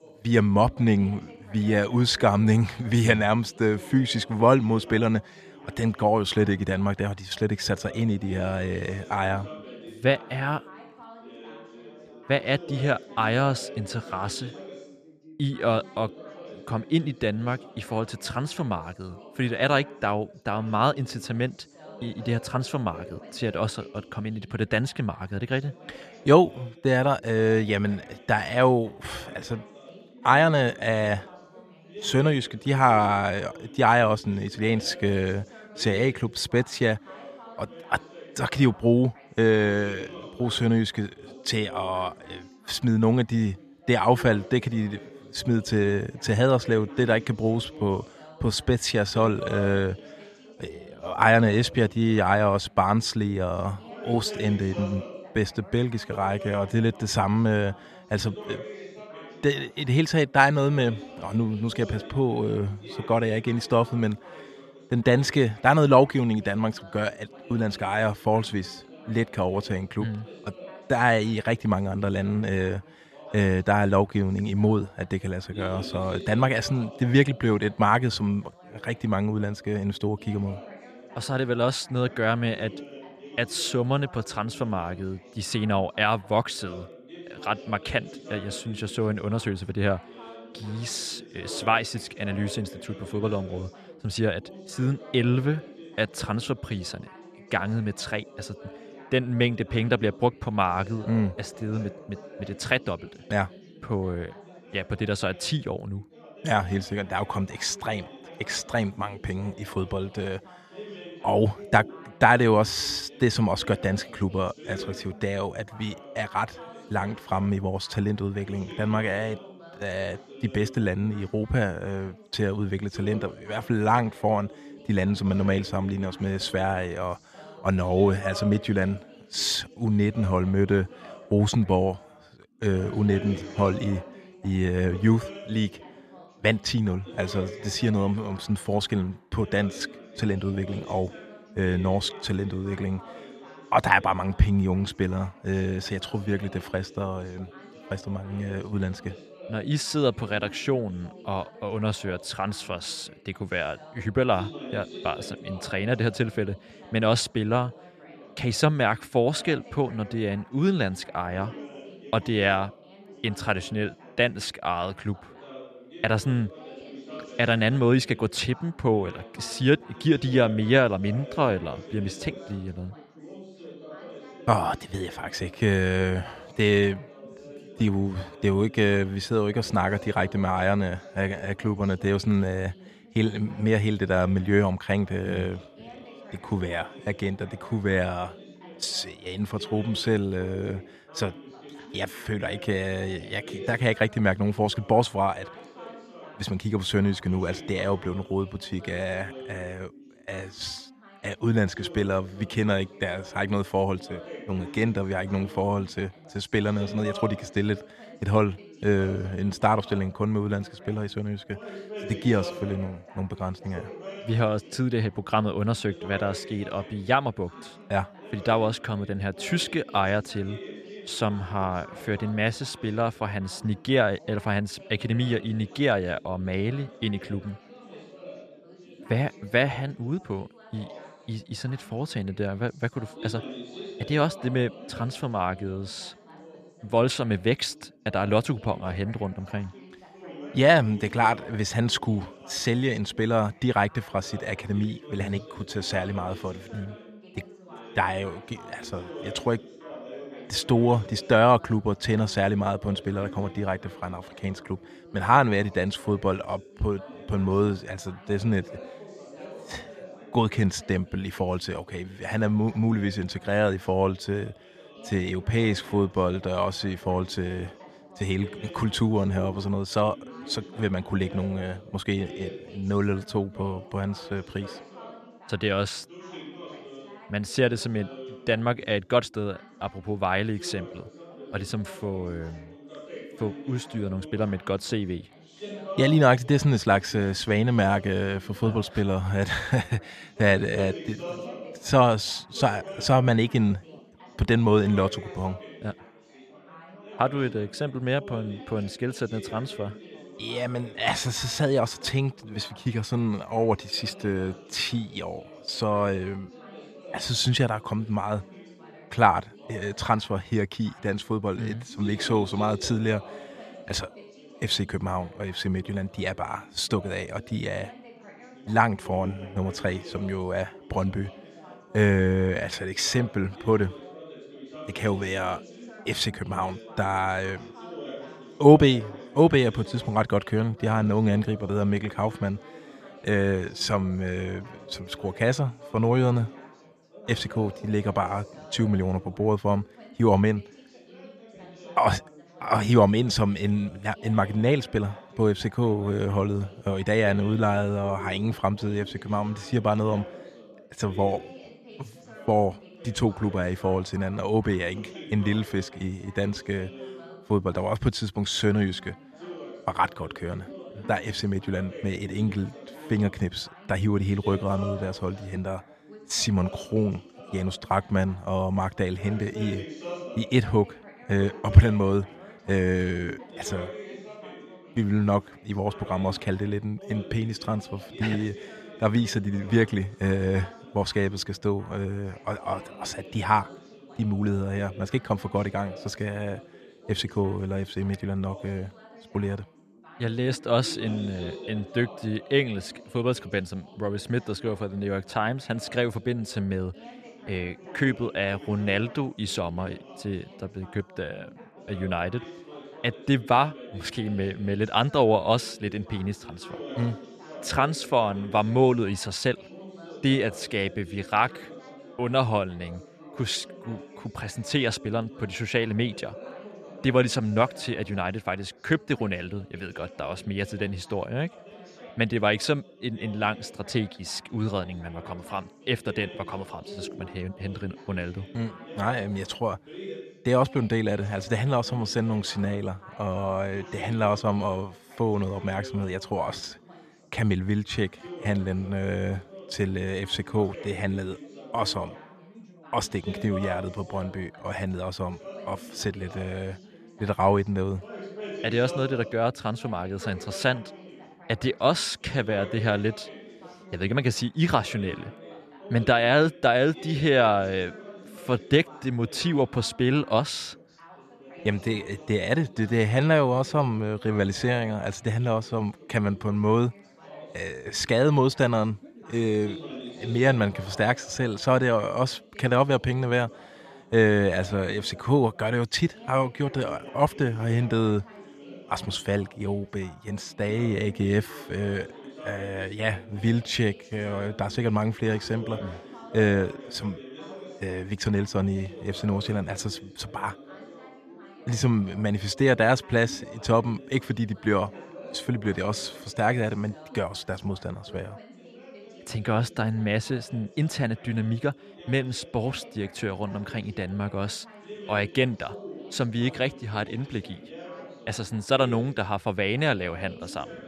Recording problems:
background chatter; noticeable; throughout; 3 voices, 20 dB below the speech

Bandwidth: 14 kHz